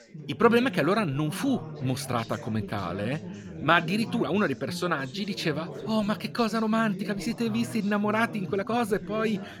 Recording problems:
background chatter; noticeable; throughout; 4 voices, 10 dB below the speech
uneven, jittery; strongly; from 1 to 9 s

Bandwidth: 17 kHz